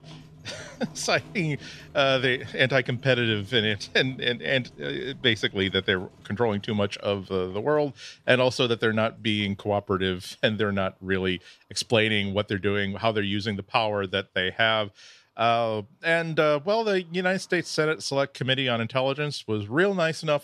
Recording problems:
animal sounds; faint; throughout; 25 dB below the speech

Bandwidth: 13.5 kHz